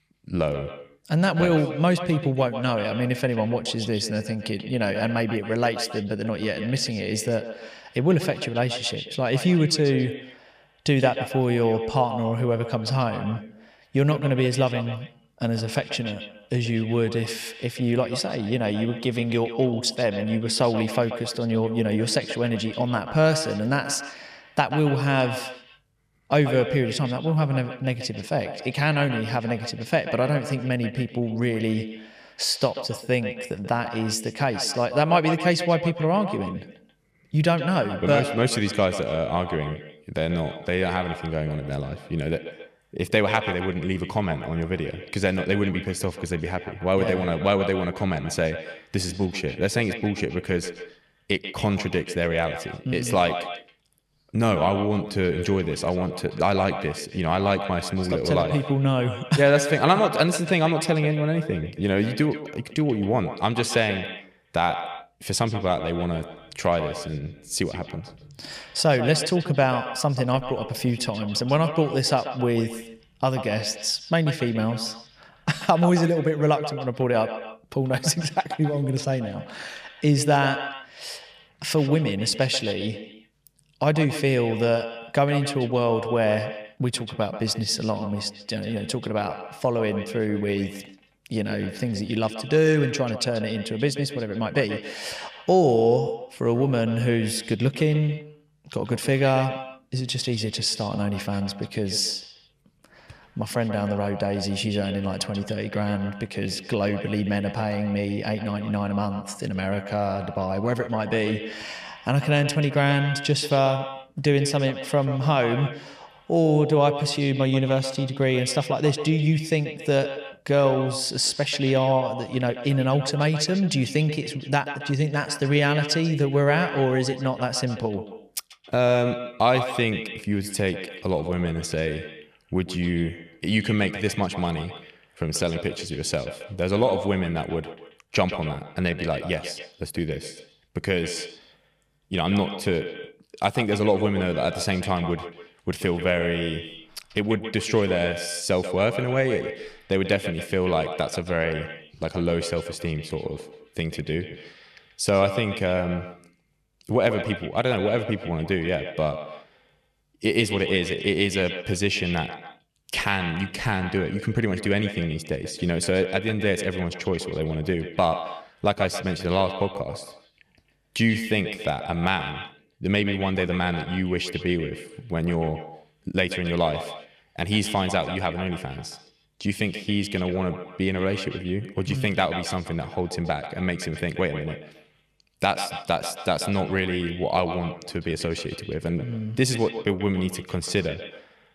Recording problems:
echo of what is said; strong; throughout; 140 ms later, 10 dB below the speech

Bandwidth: 15 kHz